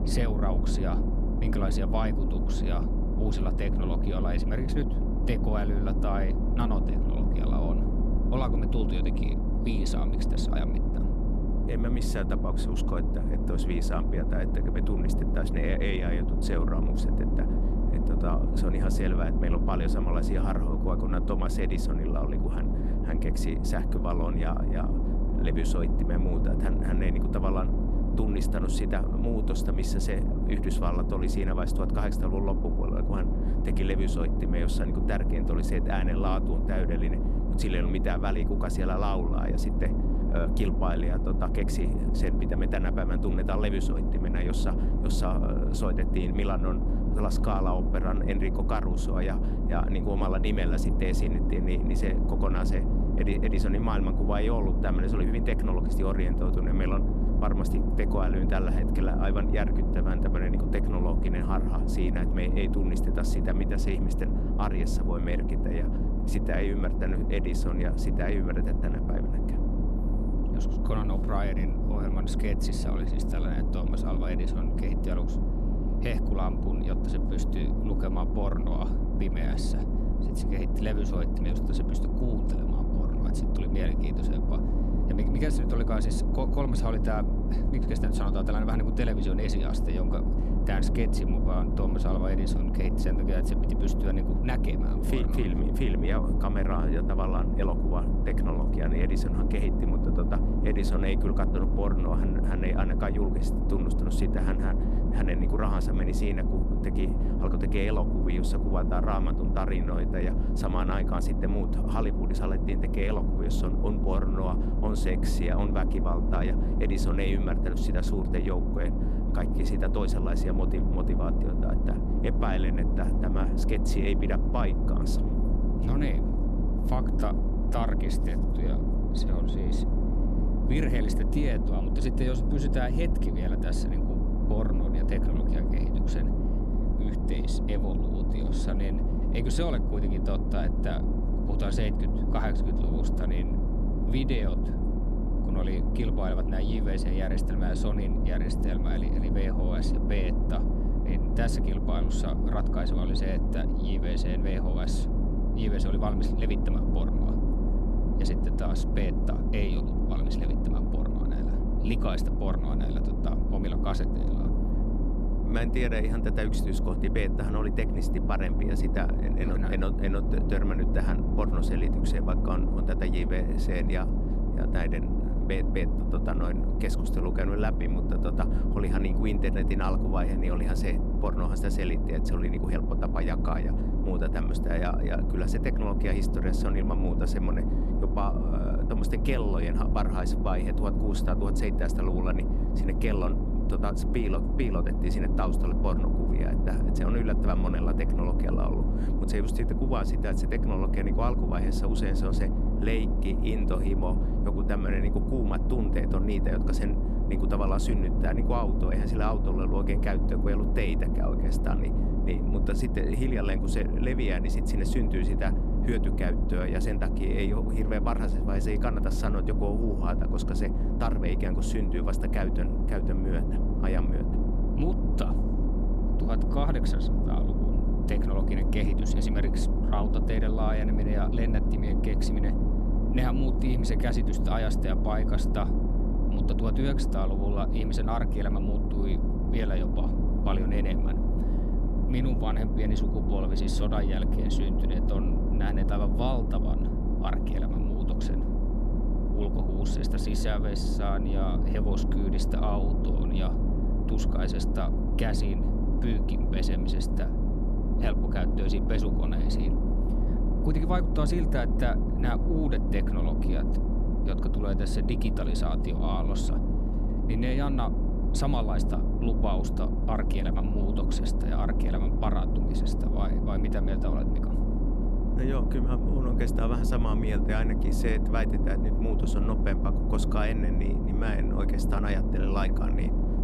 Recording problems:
low rumble; loud; throughout; 2 dB below the speech

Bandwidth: 13.5 kHz